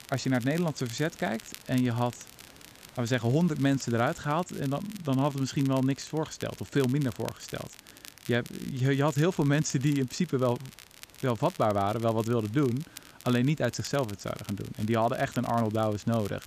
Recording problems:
high frequencies cut off; noticeable; nothing above 8 kHz
crackle, like an old record; noticeable; 20 dB below the speech
hiss; faint; throughout; 25 dB below the speech

